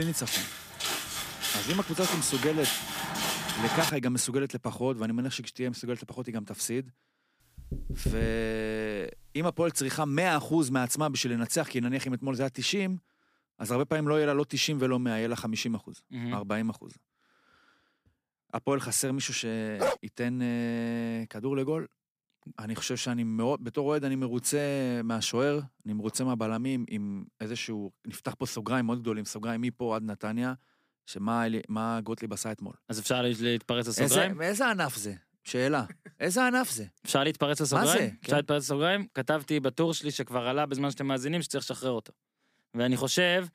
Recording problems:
abrupt cut into speech; at the start
footsteps; loud; until 4 s; peak 1 dB above the speech
door banging; noticeable; from 7.5 to 8.5 s; peak 4 dB below the speech
dog barking; noticeable; at 20 s; peak 1 dB below the speech

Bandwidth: 15 kHz